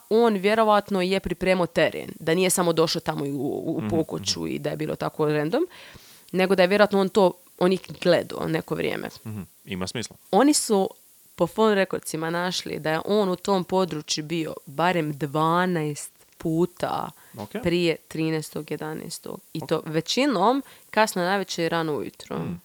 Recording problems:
hiss; faint; throughout; 25 dB below the speech

